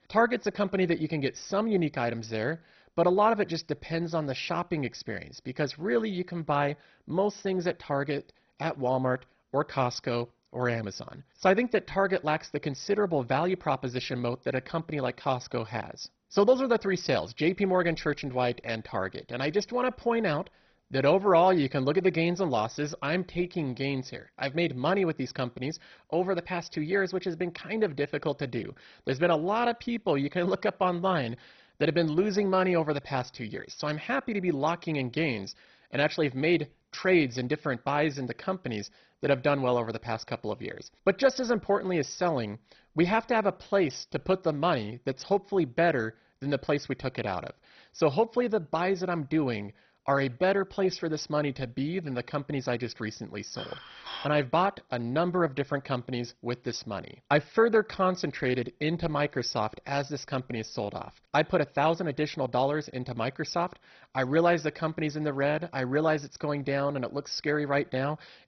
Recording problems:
garbled, watery; badly; nothing above 6 kHz
clattering dishes; faint; at 54 s; peak 10 dB below the speech

